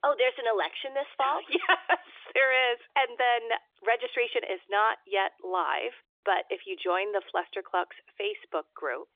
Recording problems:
phone-call audio; nothing above 3 kHz

